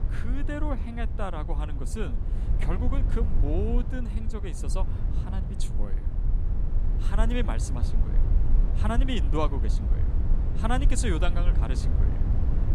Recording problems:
low rumble; loud; throughout; 9 dB below the speech

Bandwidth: 14.5 kHz